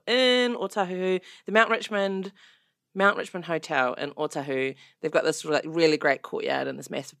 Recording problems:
none

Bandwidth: 14.5 kHz